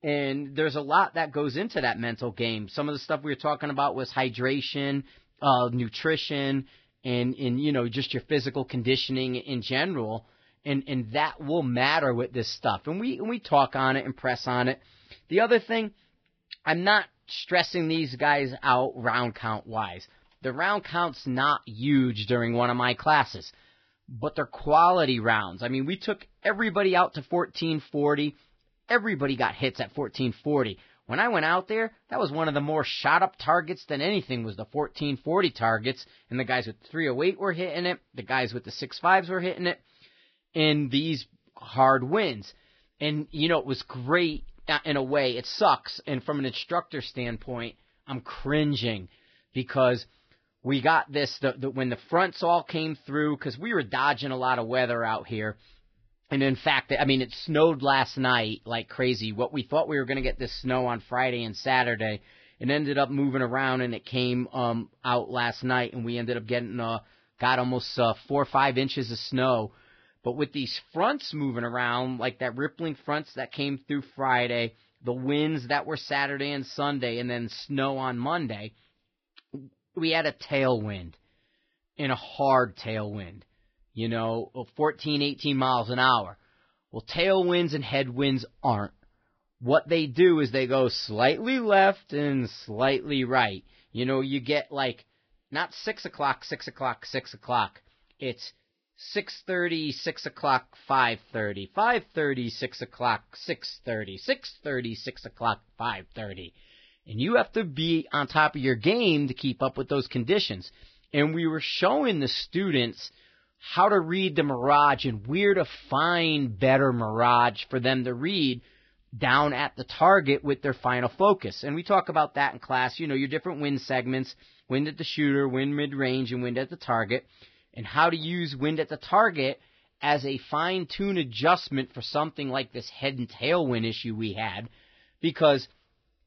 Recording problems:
garbled, watery; badly; nothing above 5.5 kHz

